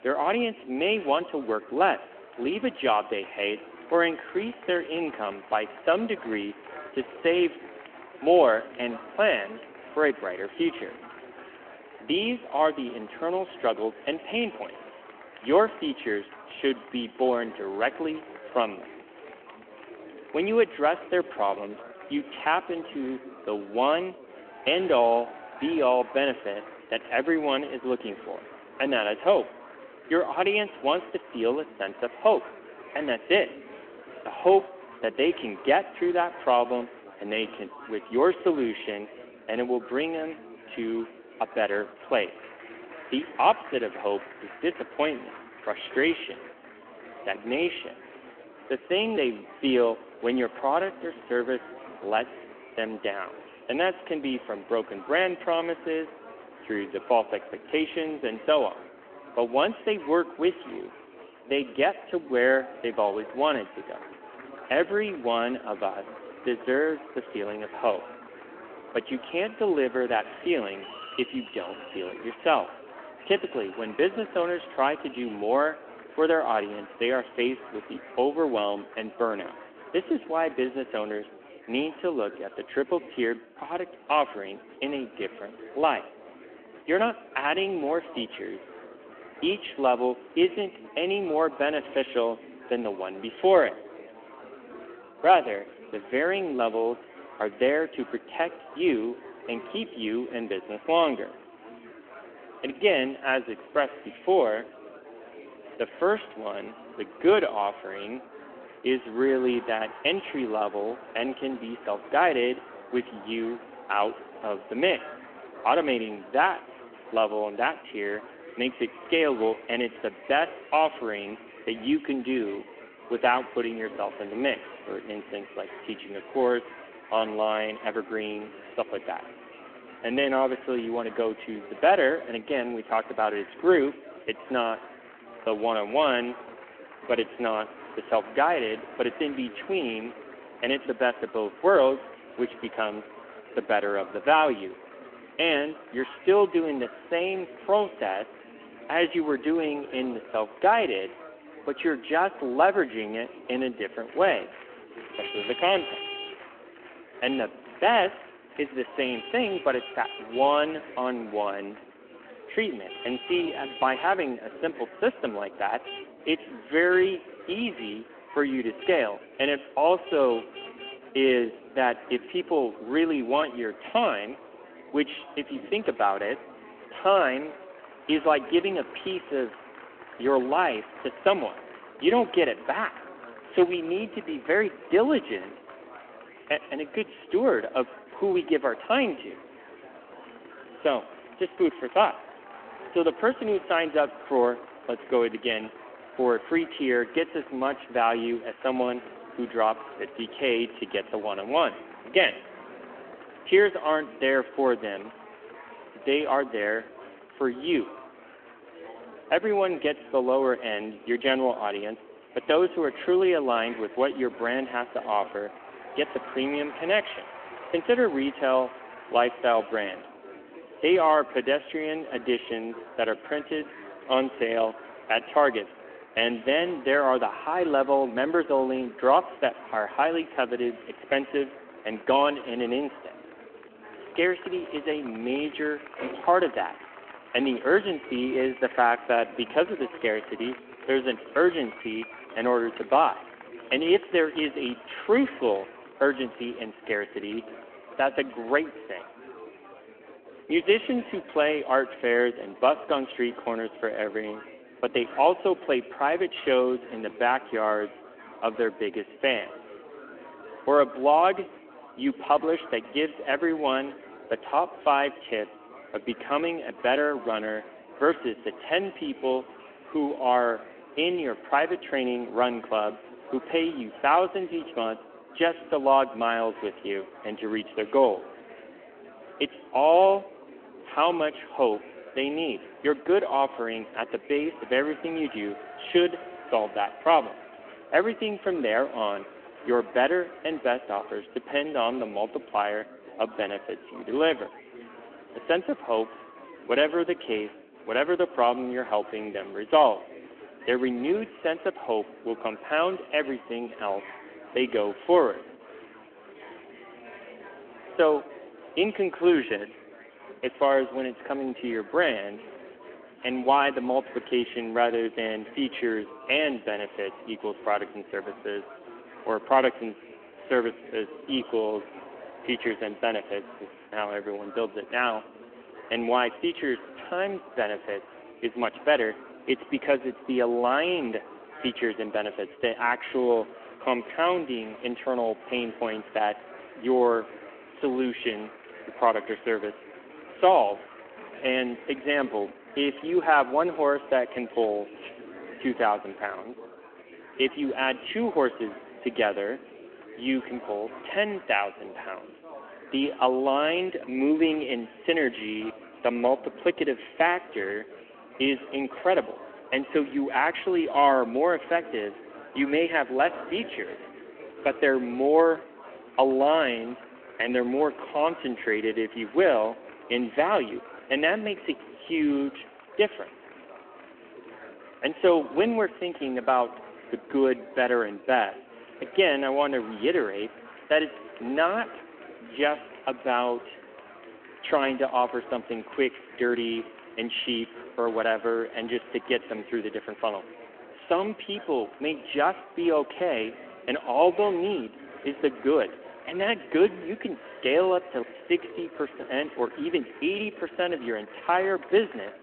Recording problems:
echo of what is said; faint; throughout; 110 ms later, 25 dB below the speech
phone-call audio
traffic noise; noticeable; throughout; 20 dB below the speech
chatter from many people; noticeable; throughout; 20 dB below the speech

